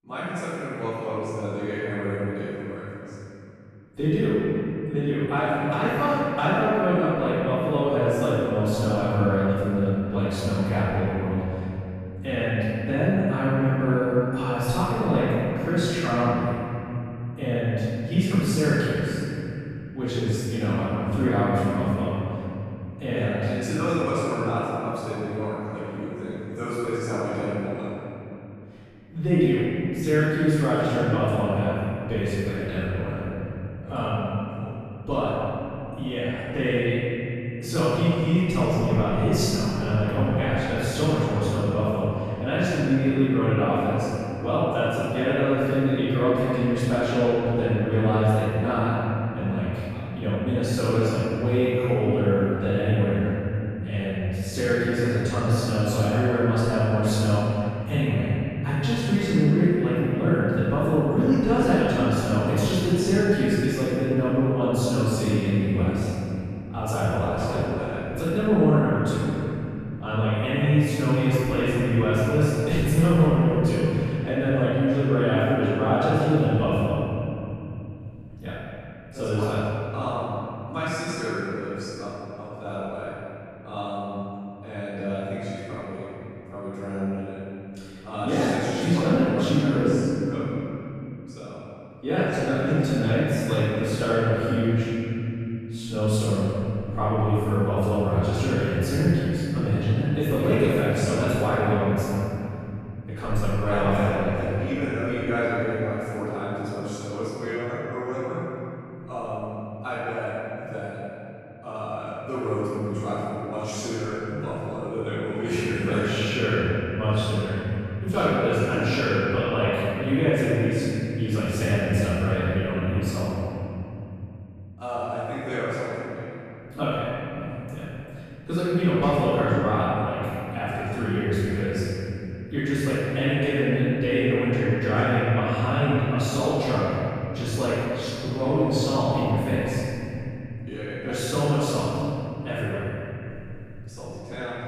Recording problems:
room echo; strong; dies away in 3 s
off-mic speech; far

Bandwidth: 13.5 kHz